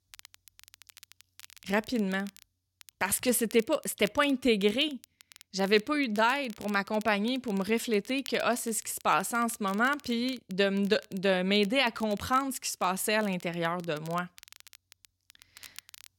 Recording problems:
crackle, like an old record; faint; 25 dB below the speech

